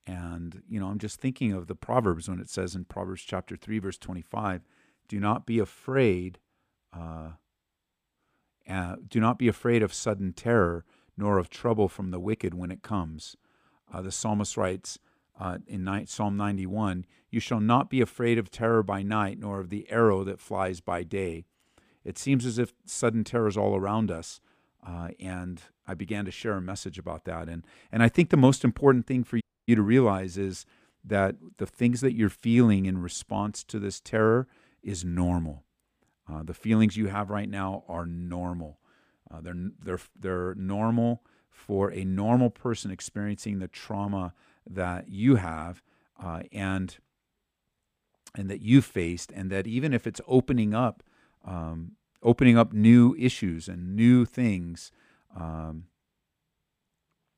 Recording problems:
audio cutting out; at 29 s

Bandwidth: 15 kHz